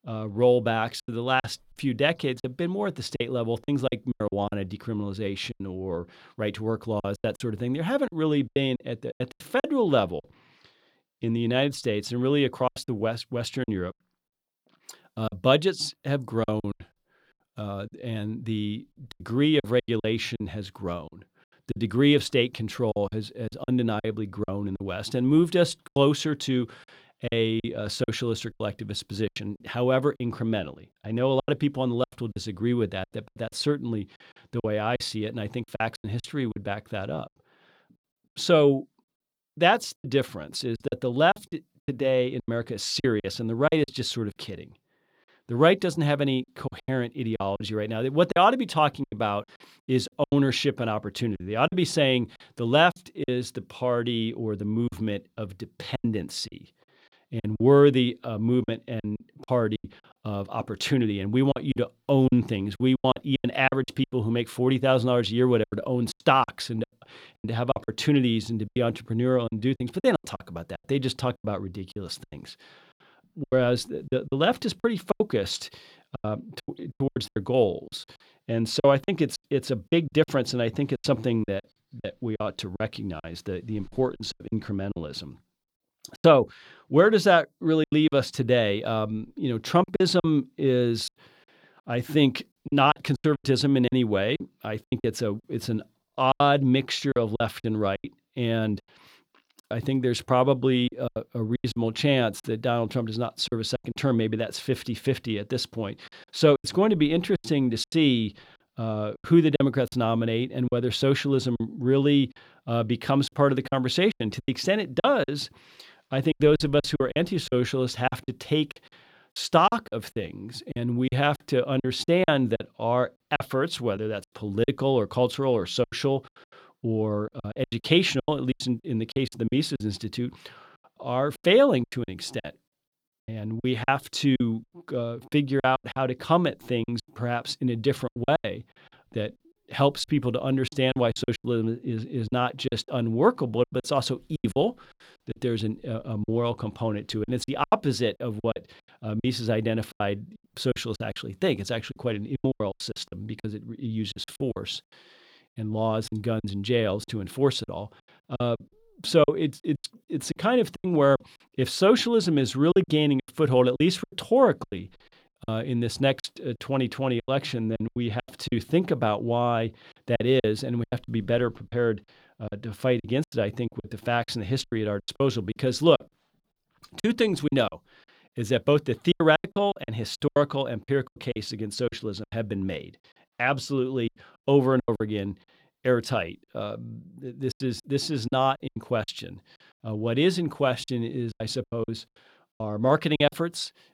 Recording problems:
choppy; very; 12% of the speech affected

